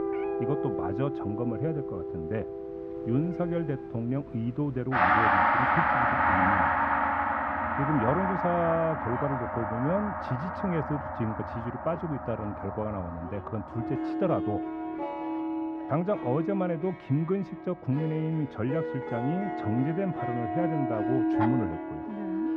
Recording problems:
muffled; very; fading above 1.5 kHz
background music; very loud; throughout; 2 dB above the speech
animal sounds; noticeable; throughout; 15 dB below the speech

